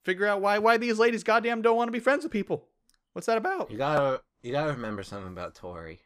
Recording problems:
none

